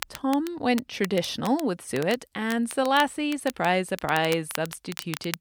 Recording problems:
crackle, like an old record; noticeable; 15 dB below the speech

